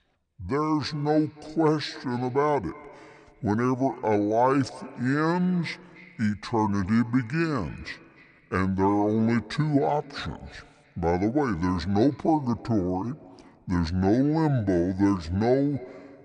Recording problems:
wrong speed and pitch; too slow and too low; 0.7 times normal speed
echo of what is said; faint; throughout; 300 ms later, 20 dB below the speech

